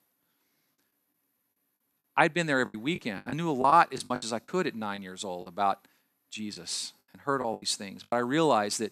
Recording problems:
choppy; very; 11% of the speech affected

